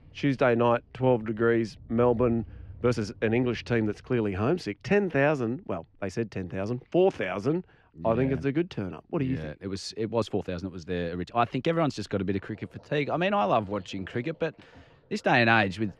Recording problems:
muffled; slightly; fading above 3.5 kHz
rain or running water; faint; throughout; 25 dB below the speech
uneven, jittery; strongly; from 1 to 15 s

